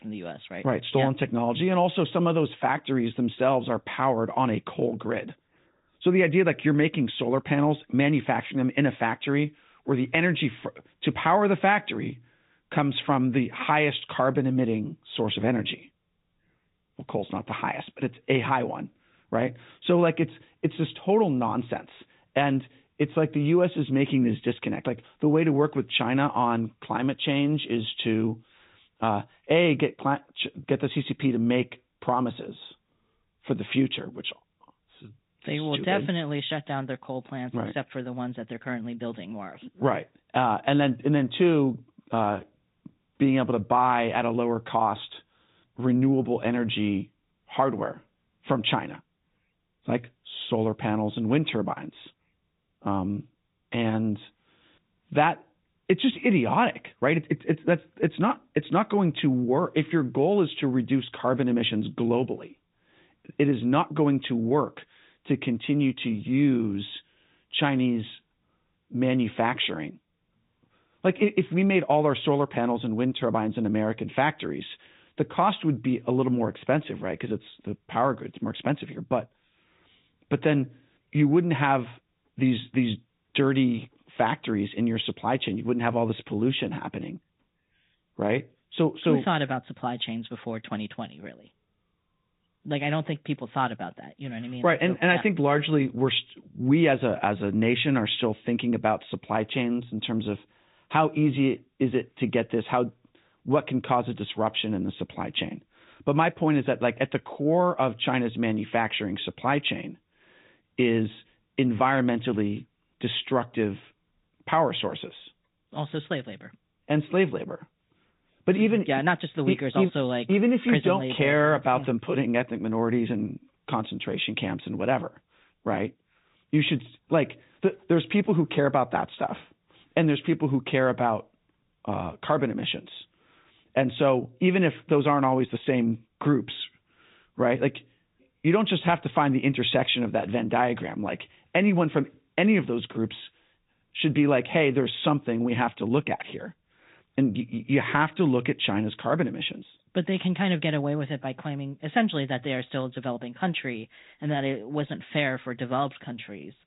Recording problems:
high frequencies cut off; severe; nothing above 4 kHz
garbled, watery; slightly

